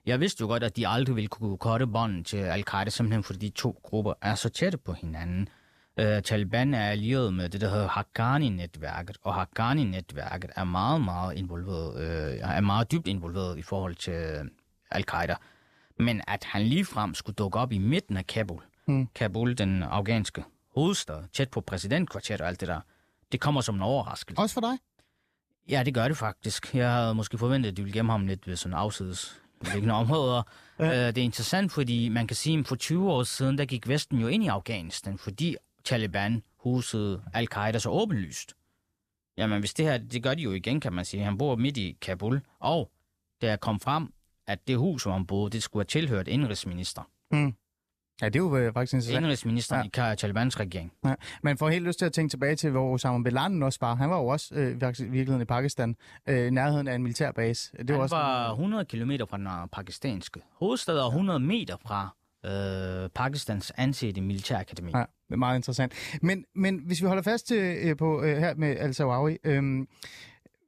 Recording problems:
none

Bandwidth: 14.5 kHz